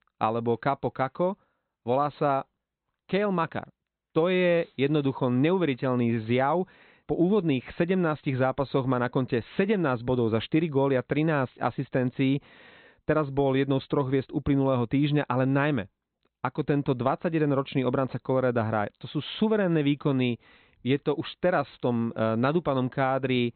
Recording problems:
high frequencies cut off; severe; nothing above 4 kHz

